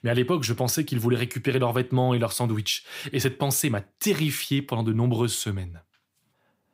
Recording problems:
none

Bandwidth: 15.5 kHz